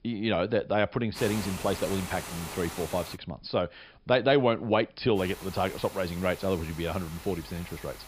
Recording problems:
high frequencies cut off; noticeable; nothing above 5.5 kHz
hiss; noticeable; from 1 to 3 s and from 5 s on; 10 dB below the speech

